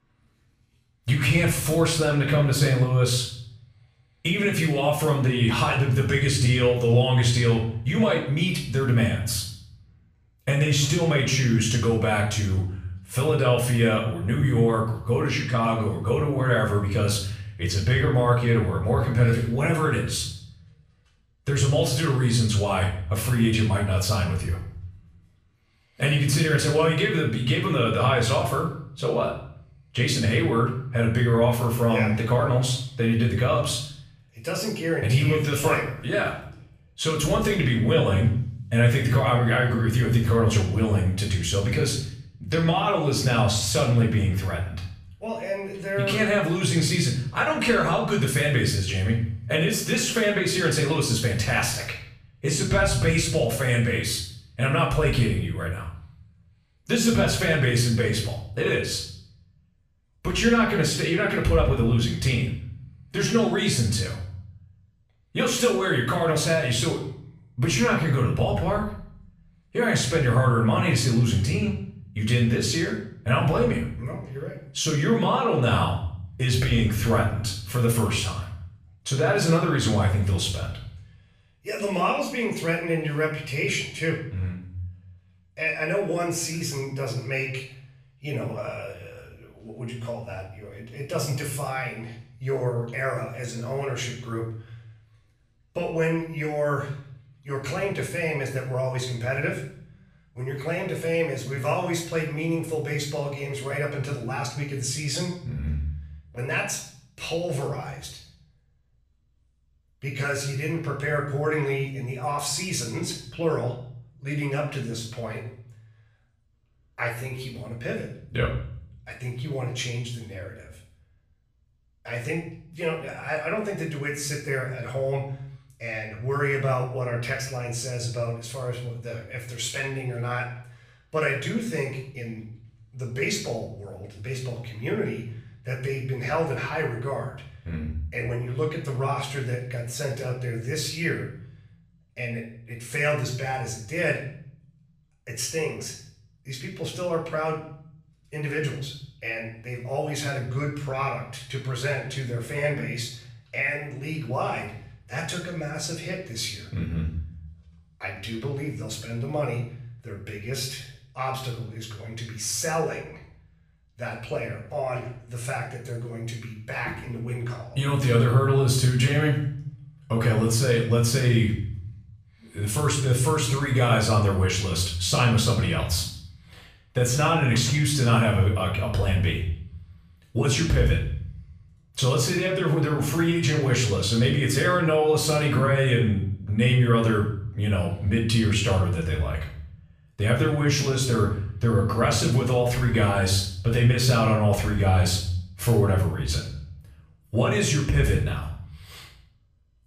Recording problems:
off-mic speech; far
room echo; noticeable; dies away in 0.6 s

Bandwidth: 15 kHz